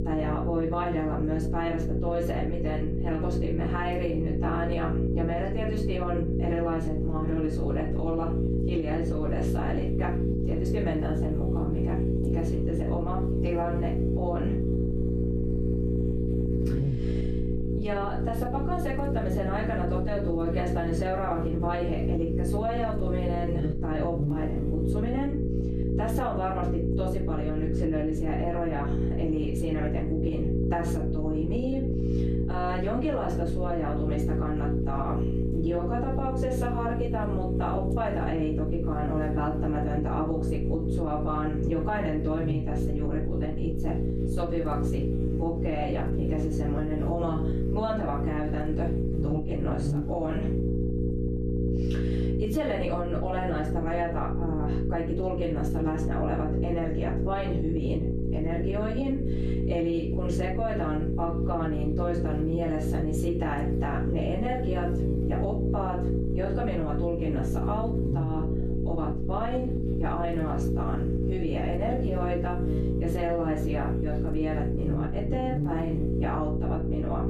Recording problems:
off-mic speech; far
room echo; slight; dies away in 0.3 s
squashed, flat; somewhat
electrical hum; loud; throughout; 60 Hz, 4 dB below the speech

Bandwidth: 13.5 kHz